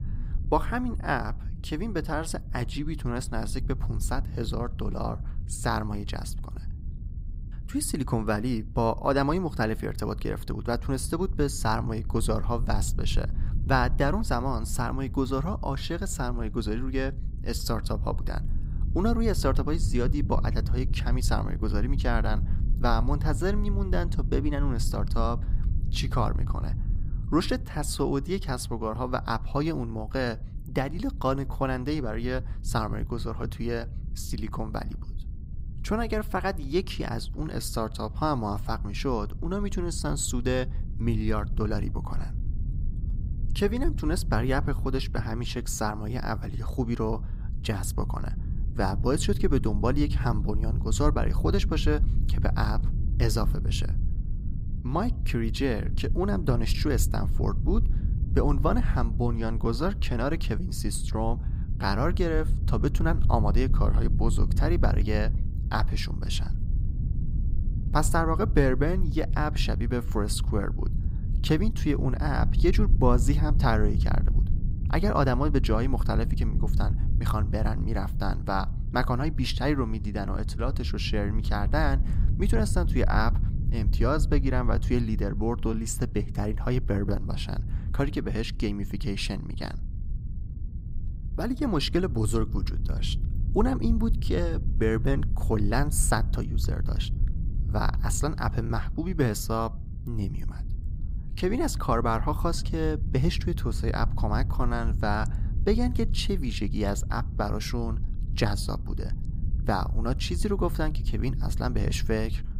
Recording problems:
low rumble; noticeable; throughout; 15 dB below the speech

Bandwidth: 15.5 kHz